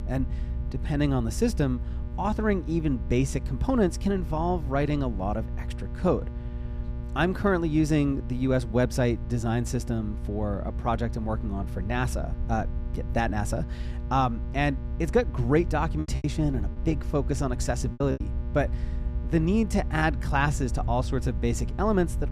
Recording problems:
electrical hum; noticeable; throughout; 60 Hz, 20 dB below the speech
low rumble; faint; throughout; 25 dB below the speech
choppy; very; from 16 to 18 s; 14% of the speech affected

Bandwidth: 14.5 kHz